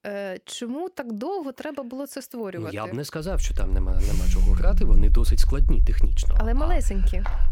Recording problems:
low rumble; noticeable; from 3.5 s on; 15 dB below the speech
phone ringing; noticeable; from 4 to 5 s; peak 3 dB below the speech
footsteps; very faint; at 7 s; peak 9 dB below the speech

